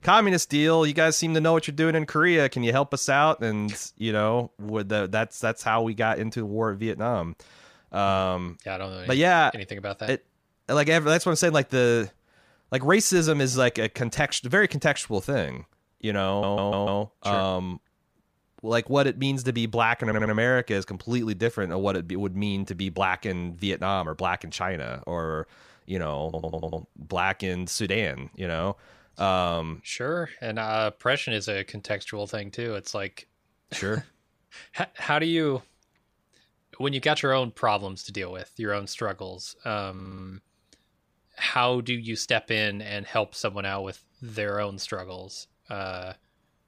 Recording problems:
audio stuttering; 4 times, first at 16 s

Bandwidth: 15 kHz